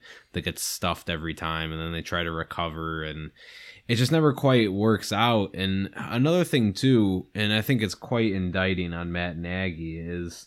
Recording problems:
none

